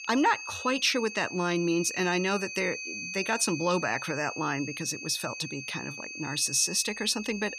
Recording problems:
high-pitched whine; loud; throughout; 2.5 kHz, 8 dB below the speech

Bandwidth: 15 kHz